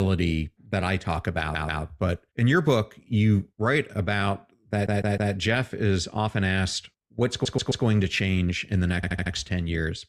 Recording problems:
abrupt cut into speech; at the start
audio stuttering; 4 times, first at 1.5 s

